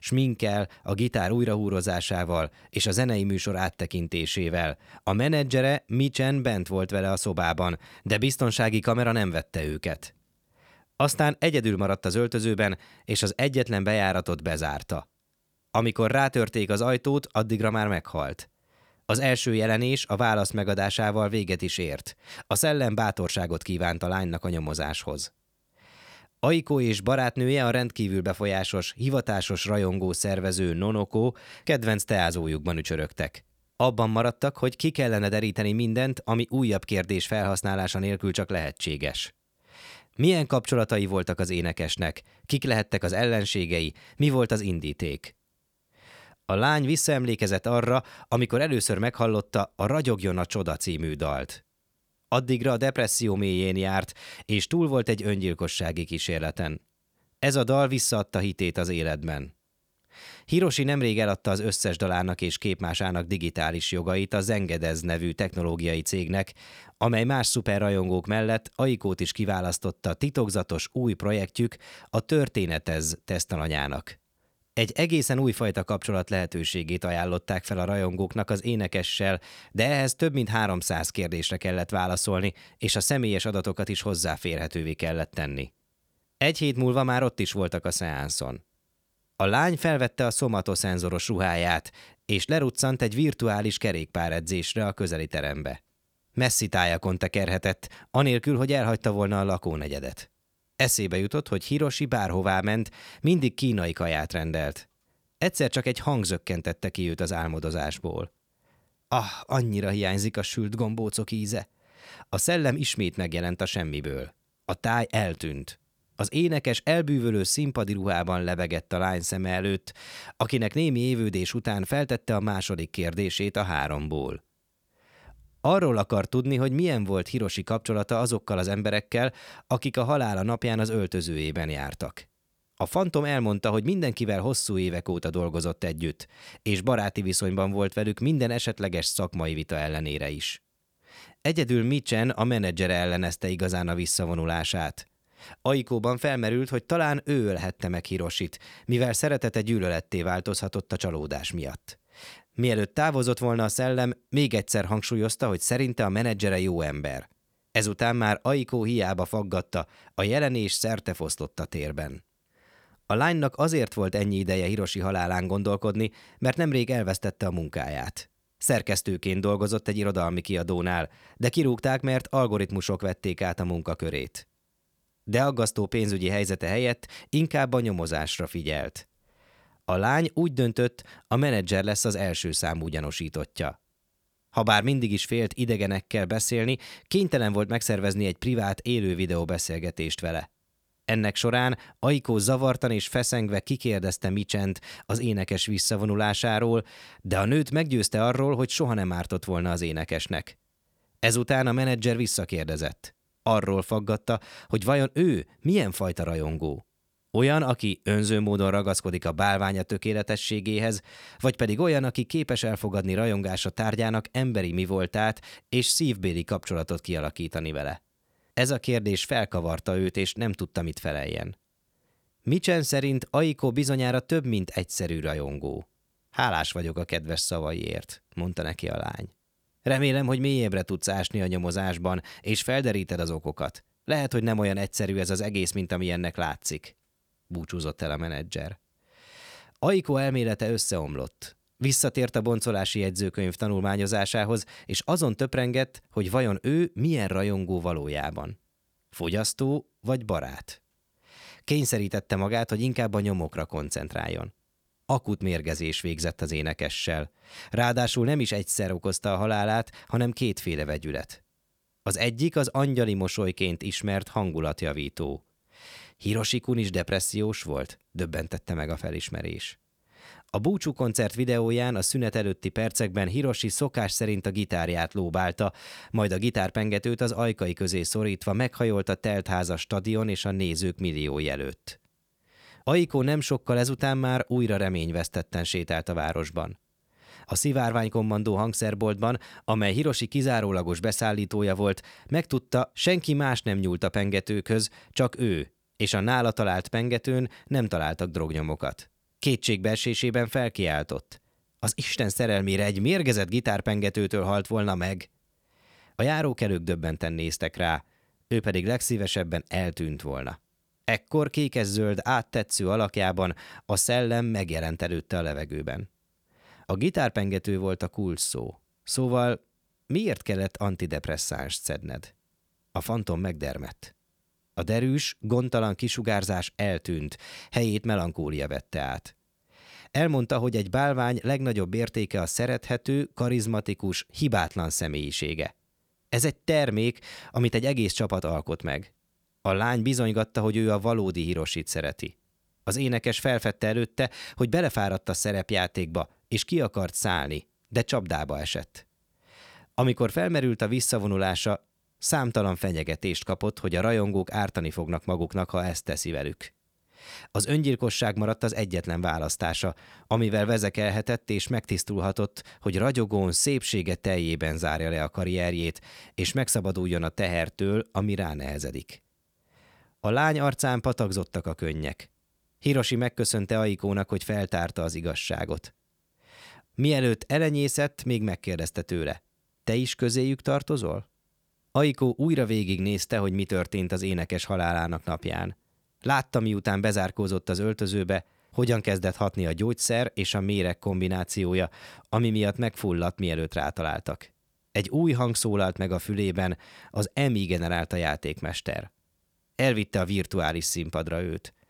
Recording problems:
none

